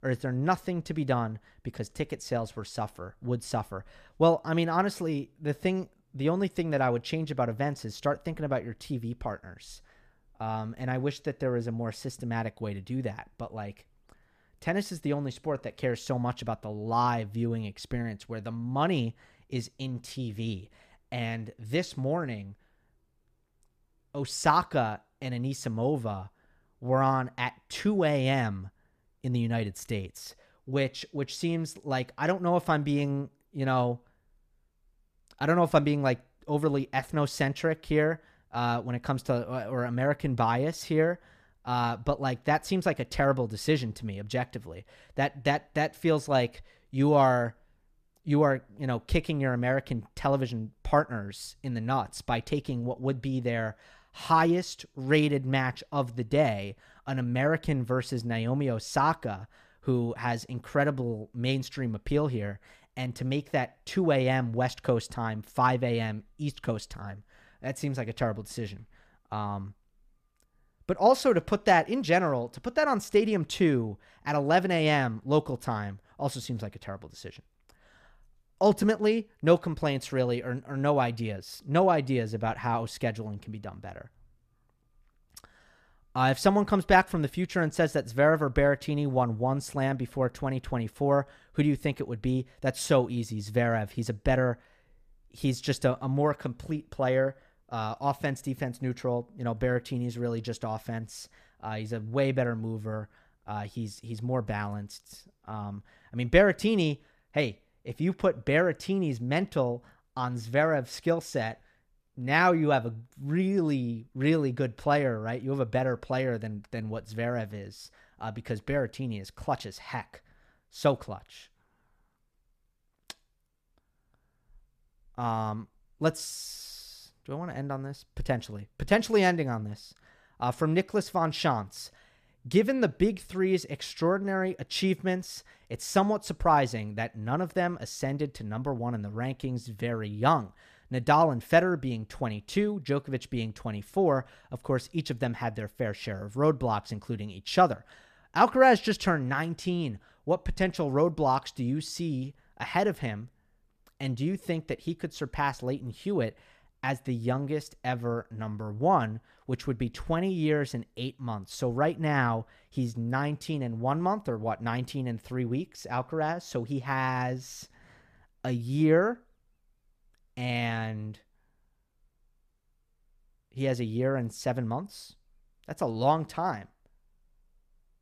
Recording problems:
none

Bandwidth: 14.5 kHz